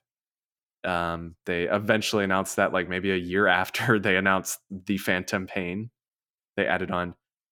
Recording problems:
none

